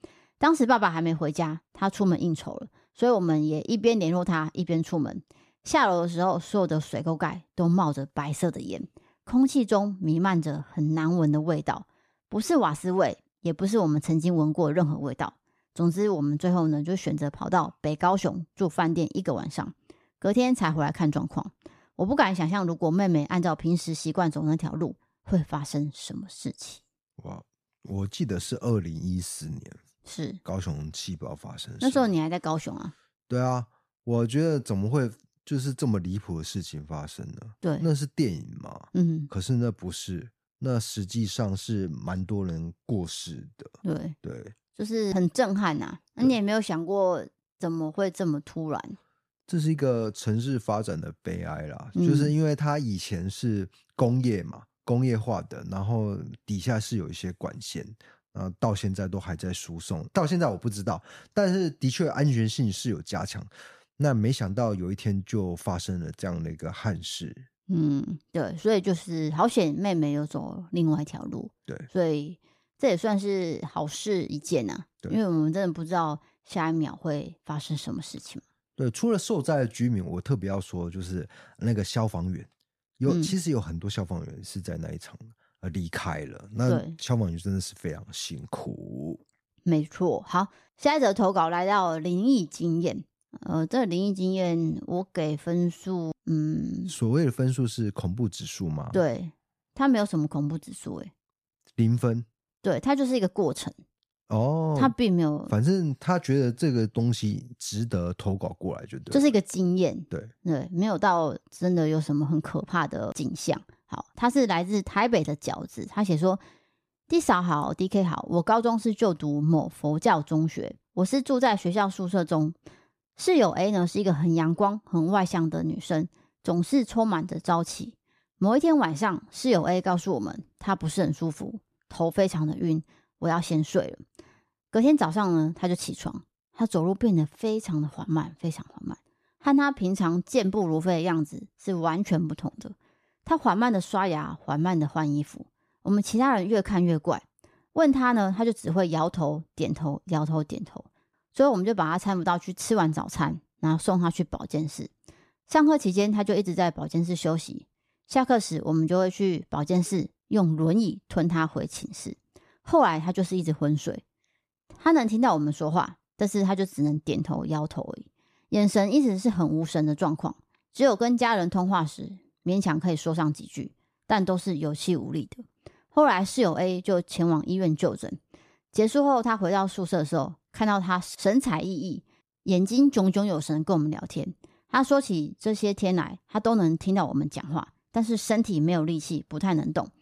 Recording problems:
none

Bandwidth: 14.5 kHz